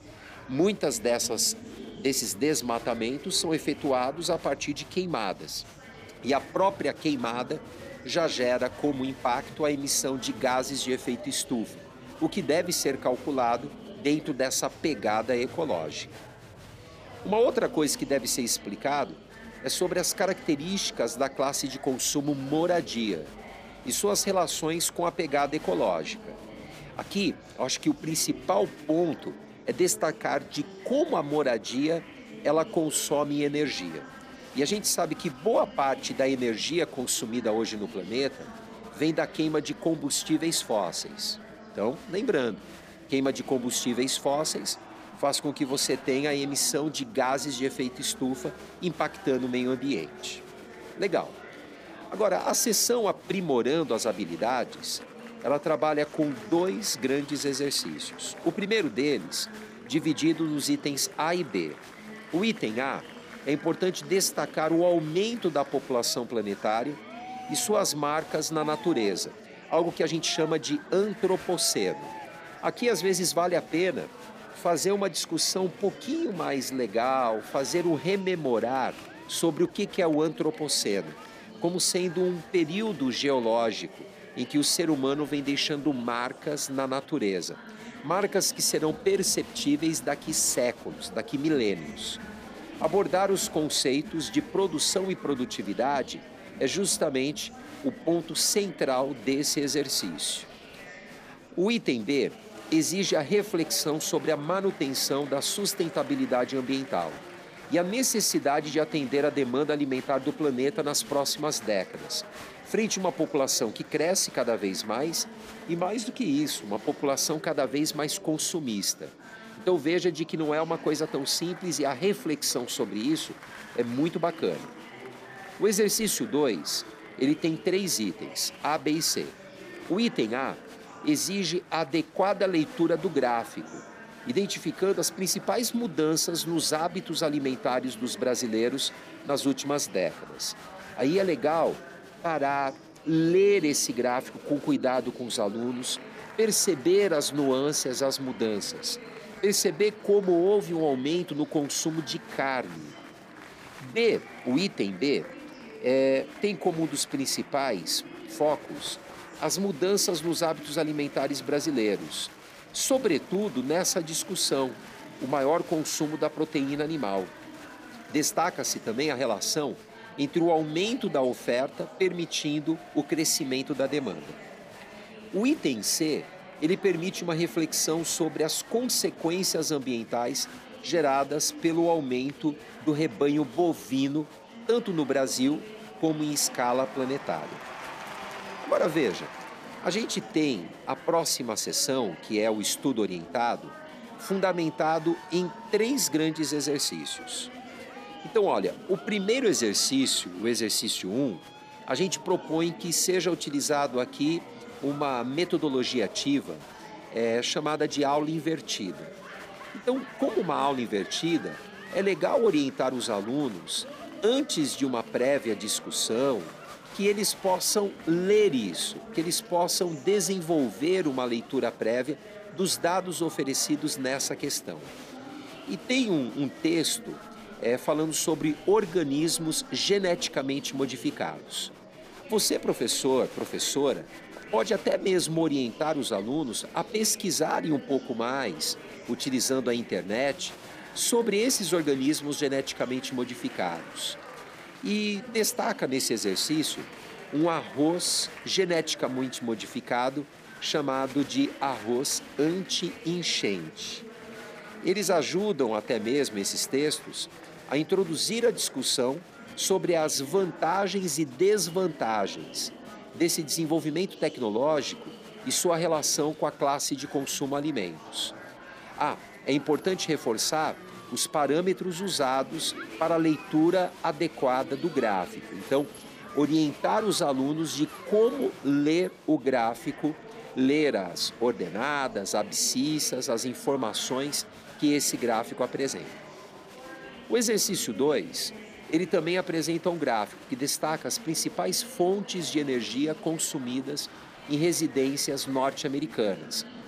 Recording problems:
murmuring crowd; noticeable; throughout; 15 dB below the speech

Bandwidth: 15 kHz